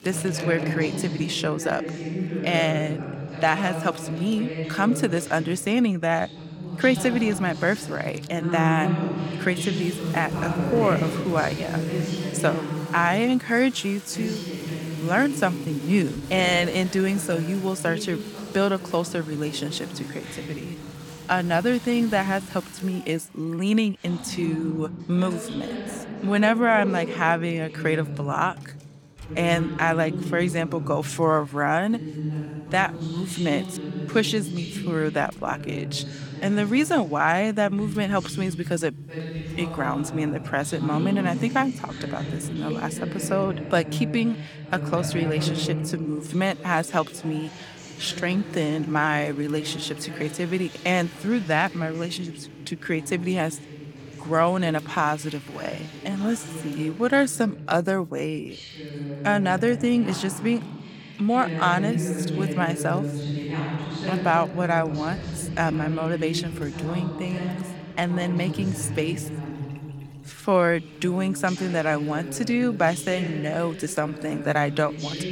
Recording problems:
voice in the background; loud; throughout; 7 dB below the speech
household noises; faint; throughout; 20 dB below the speech

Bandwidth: 18 kHz